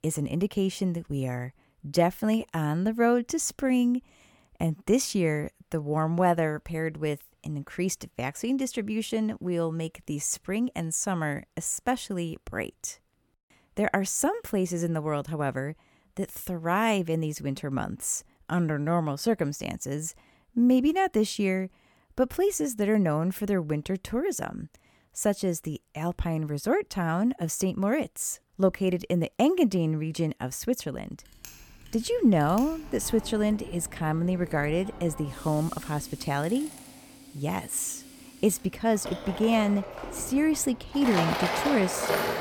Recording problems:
machinery noise; loud; from 31 s on; 9 dB below the speech

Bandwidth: 18 kHz